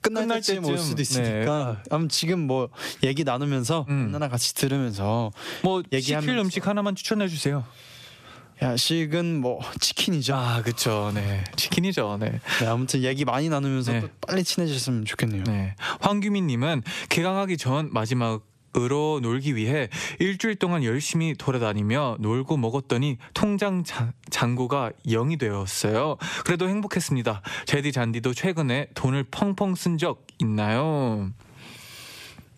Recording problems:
squashed, flat; heavily

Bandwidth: 14.5 kHz